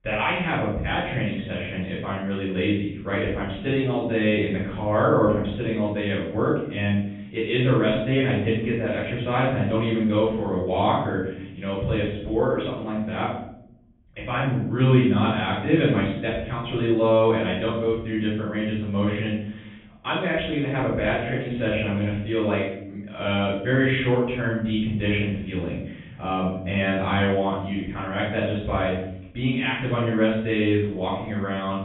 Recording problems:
off-mic speech; far
high frequencies cut off; severe; nothing above 3.5 kHz
room echo; noticeable; dies away in 0.8 s

